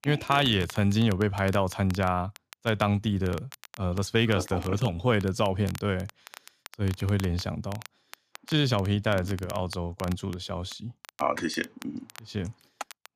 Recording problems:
crackle, like an old record; noticeable; 20 dB below the speech

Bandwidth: 14.5 kHz